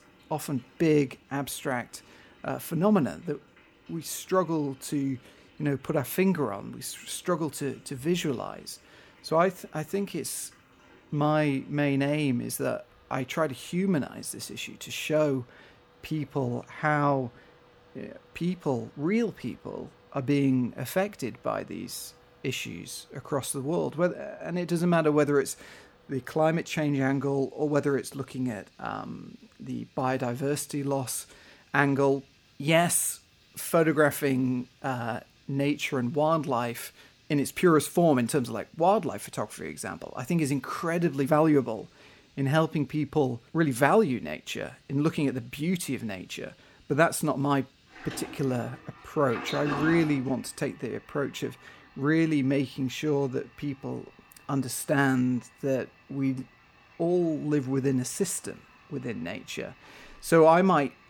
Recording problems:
household noises; faint; throughout; 20 dB below the speech

